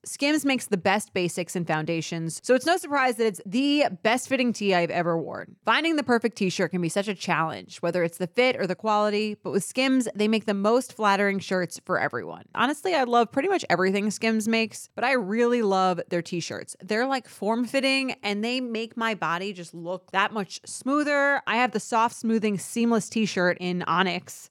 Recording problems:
none

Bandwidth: 17.5 kHz